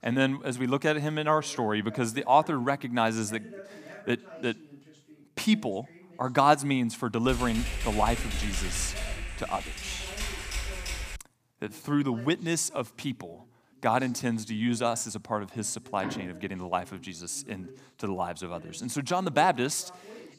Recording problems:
voice in the background; faint; throughout; 20 dB below the speech
keyboard typing; noticeable; from 7.5 to 11 s; peak 4 dB below the speech
door banging; noticeable; at 16 s; peak 9 dB below the speech

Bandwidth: 15 kHz